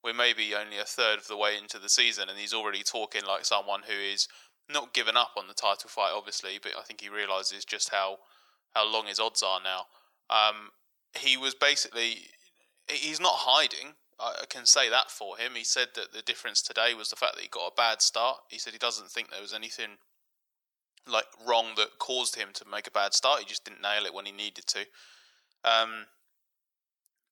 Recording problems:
thin; very; fading below 850 Hz

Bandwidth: 18.5 kHz